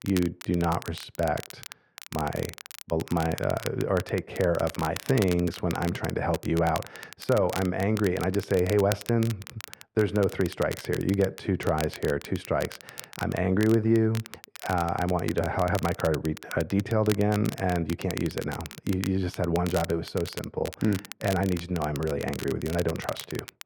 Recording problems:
muffled; very; fading above 3.5 kHz
crackle, like an old record; noticeable; 15 dB below the speech

